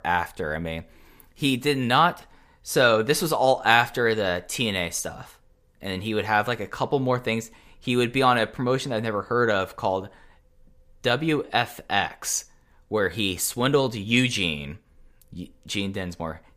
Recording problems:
none

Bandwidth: 15 kHz